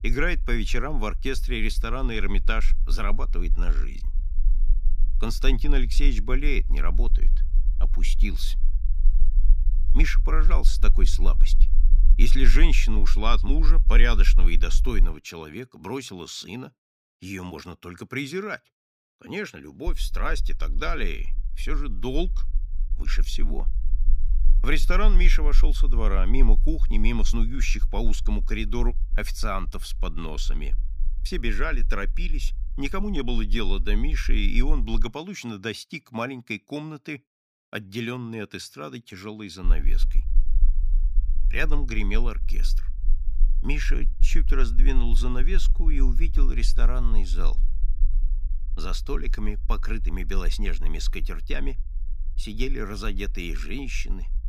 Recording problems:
low rumble; faint; until 15 s, from 20 to 35 s and from 40 s on; 20 dB below the speech

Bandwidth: 15 kHz